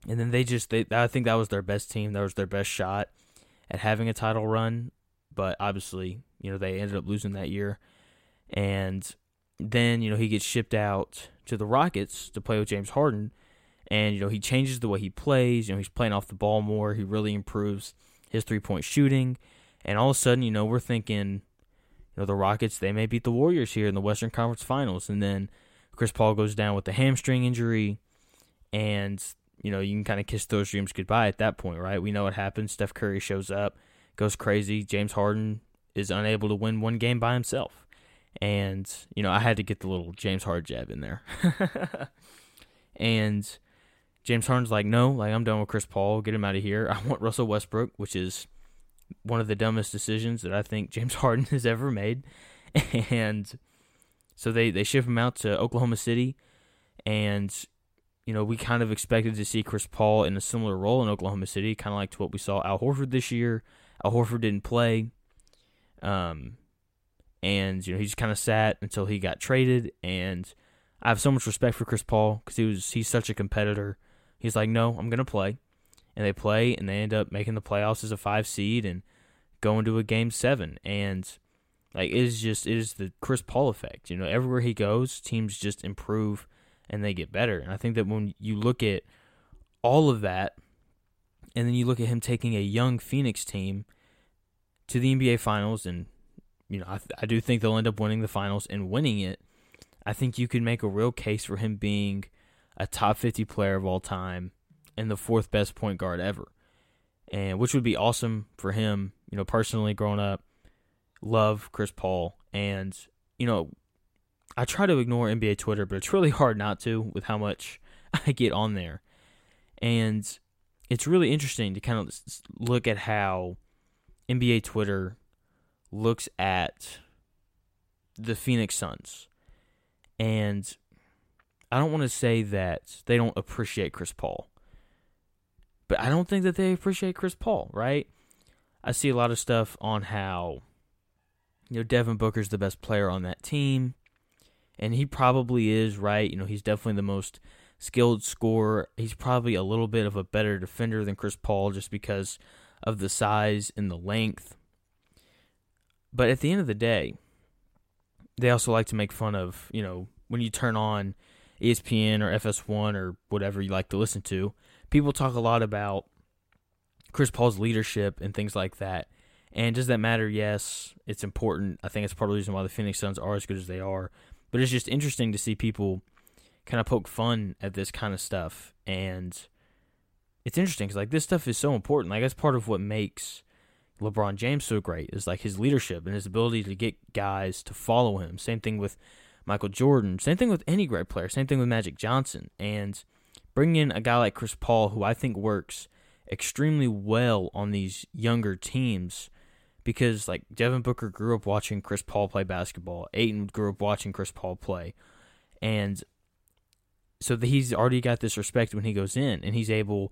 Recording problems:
none

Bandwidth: 16 kHz